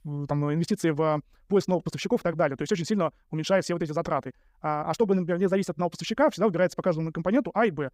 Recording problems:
wrong speed, natural pitch; too fast; 1.5 times normal speed

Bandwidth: 15.5 kHz